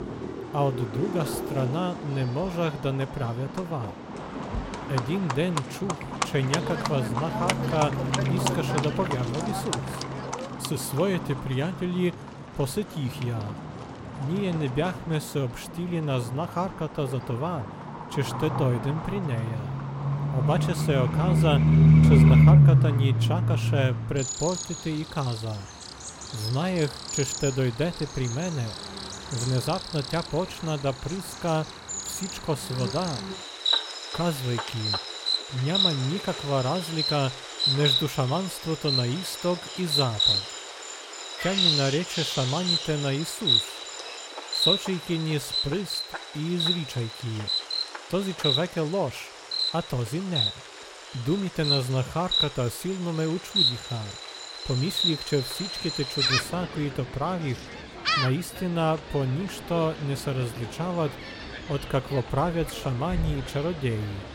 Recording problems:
animal sounds; very loud; throughout; 3 dB above the speech

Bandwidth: 16.5 kHz